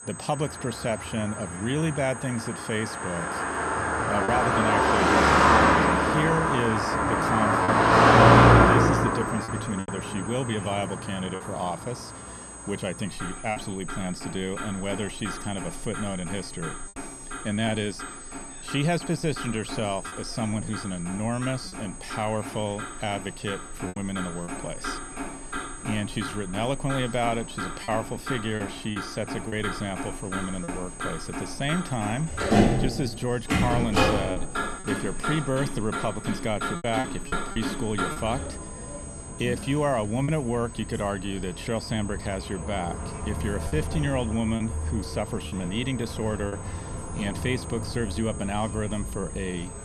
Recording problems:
traffic noise; very loud; throughout; 5 dB above the speech
high-pitched whine; noticeable; throughout; 8 kHz, 10 dB below the speech
chatter from many people; faint; throughout; 20 dB below the speech
choppy; occasionally; 3% of the speech affected

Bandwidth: 13.5 kHz